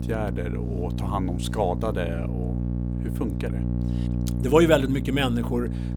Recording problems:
electrical hum; noticeable; throughout; 60 Hz, 10 dB below the speech

